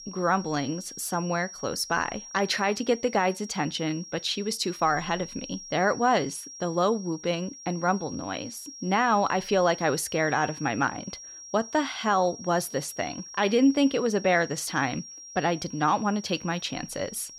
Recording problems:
high-pitched whine; noticeable; throughout; 5.5 kHz, 15 dB below the speech

